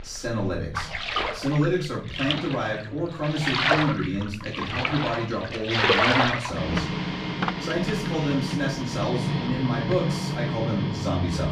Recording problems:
off-mic speech; far
room echo; slight; dies away in 0.5 s
household noises; very loud; throughout; 1 dB above the speech

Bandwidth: 15.5 kHz